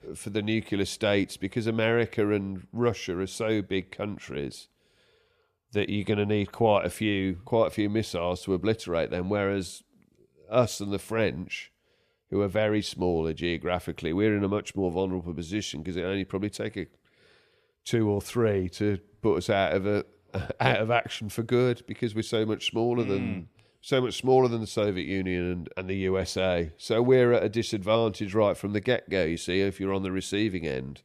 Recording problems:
none

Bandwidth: 14.5 kHz